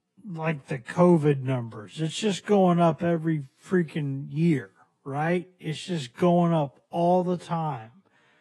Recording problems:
wrong speed, natural pitch; too slow; 0.6 times normal speed
garbled, watery; slightly

